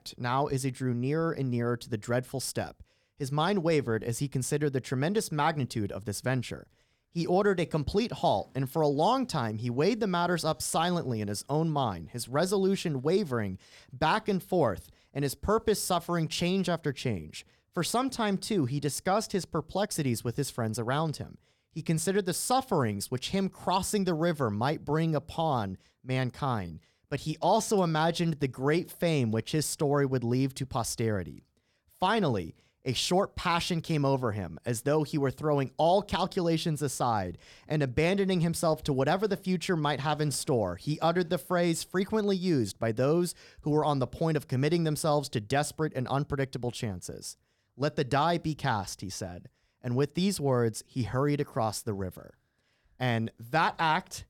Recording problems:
none

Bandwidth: 18.5 kHz